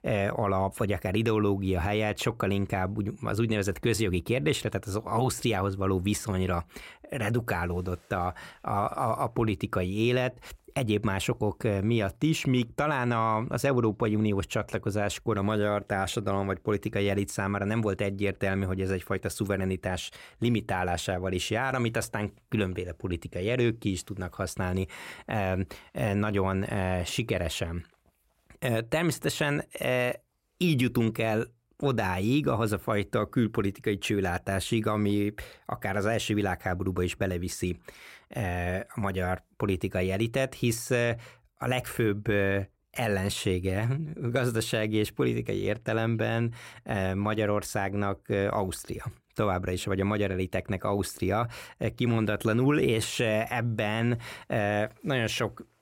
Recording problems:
none

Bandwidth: 16 kHz